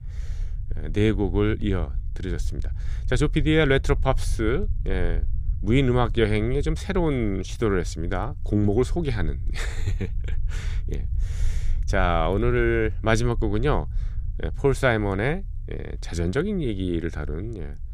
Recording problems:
low rumble; faint; throughout; 25 dB below the speech

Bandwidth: 15 kHz